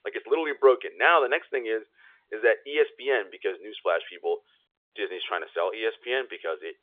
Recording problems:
phone-call audio; nothing above 3.5 kHz

